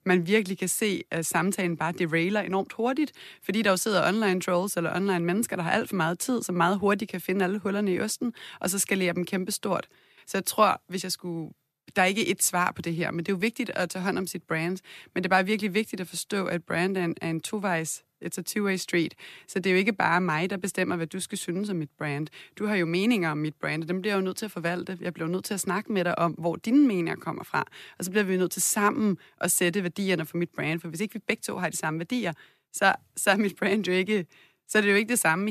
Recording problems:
abrupt cut into speech; at the end

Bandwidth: 14 kHz